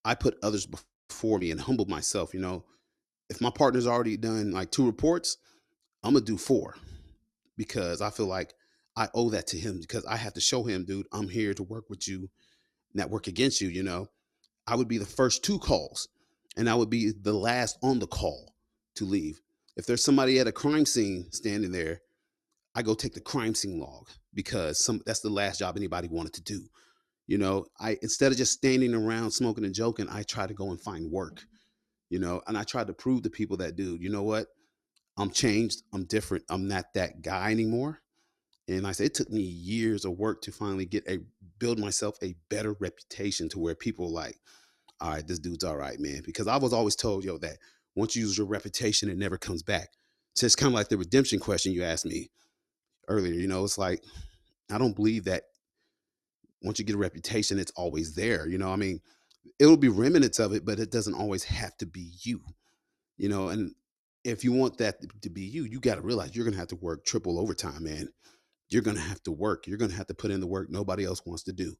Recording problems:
none

